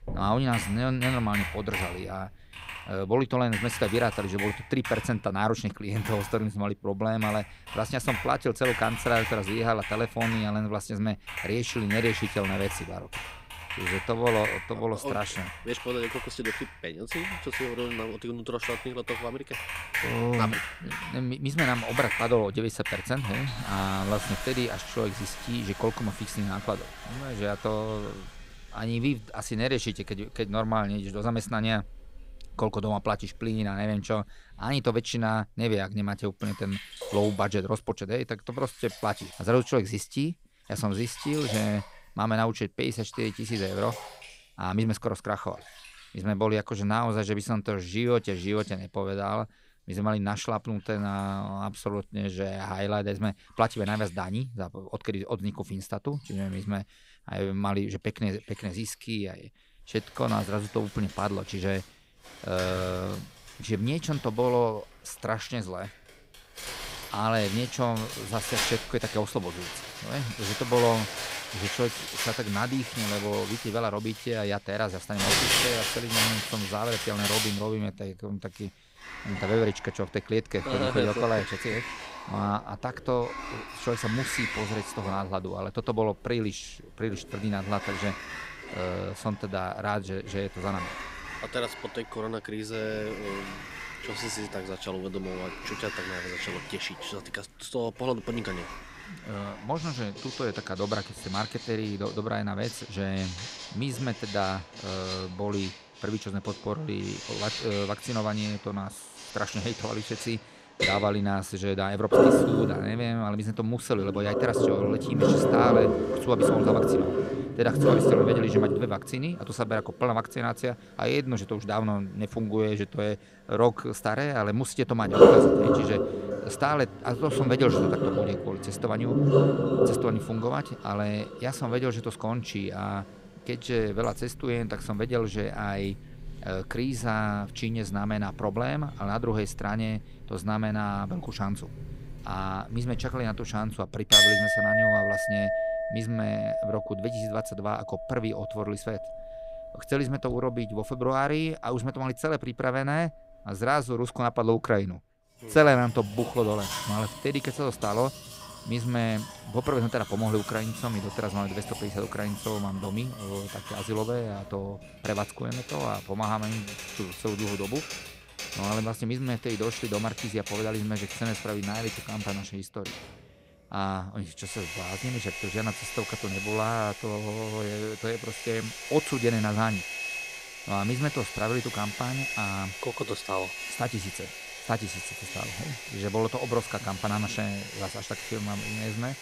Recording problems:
household noises; very loud; throughout; as loud as the speech

